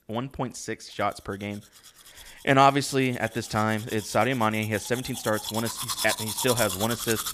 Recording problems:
household noises; loud; throughout; 6 dB below the speech

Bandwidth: 15 kHz